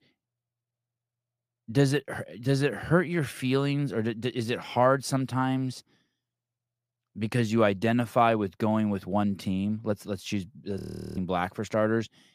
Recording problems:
audio freezing; at 11 s

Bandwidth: 15 kHz